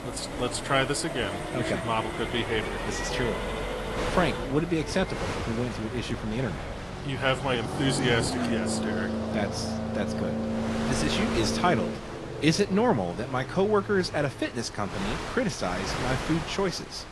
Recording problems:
garbled, watery; slightly; nothing above 11 kHz
wind noise on the microphone; heavy; 9 dB below the speech
traffic noise; loud; throughout; 4 dB below the speech

